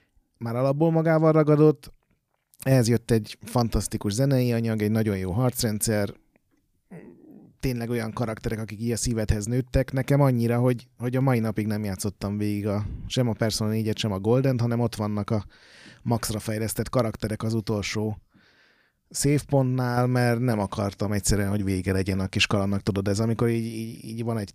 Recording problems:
none

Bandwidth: 15 kHz